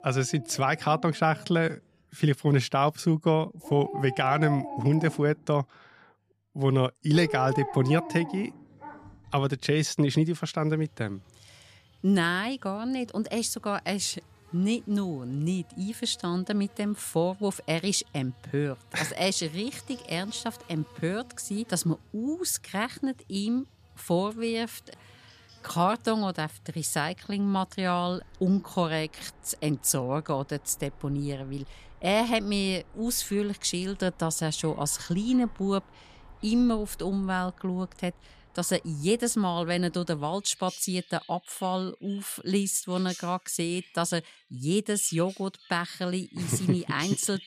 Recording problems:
animal sounds; noticeable; throughout; 15 dB below the speech

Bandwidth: 14.5 kHz